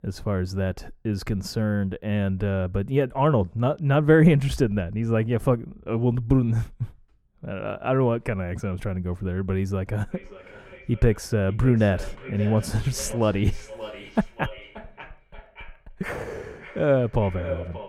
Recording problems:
echo of what is said; noticeable; from 10 s on; 580 ms later, 15 dB below the speech
muffled; slightly; fading above 2 kHz

